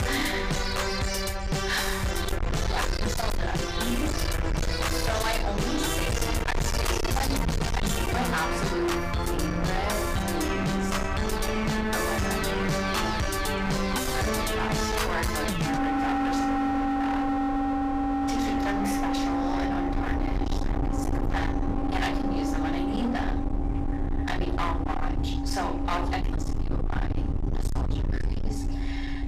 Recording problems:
distortion; heavy; 42% of the sound clipped
off-mic speech; far
room echo; slight; dies away in 0.4 s
background music; very loud; throughout; 4 dB above the speech
low rumble; loud; throughout; 7 dB below the speech
animal sounds; faint; throughout; 20 dB below the speech

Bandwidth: 15 kHz